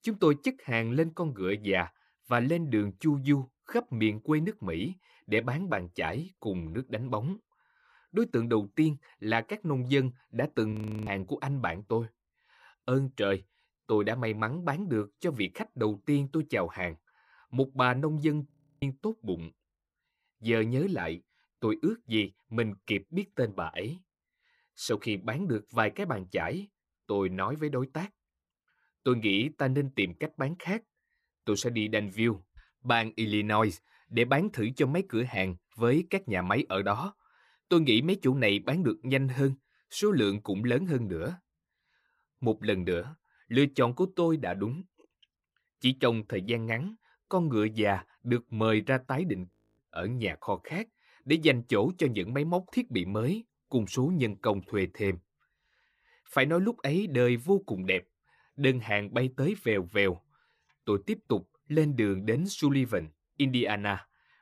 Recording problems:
audio freezing; at 11 s, at 19 s and at 50 s

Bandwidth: 14.5 kHz